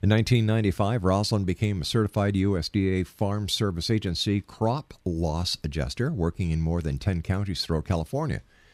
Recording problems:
none

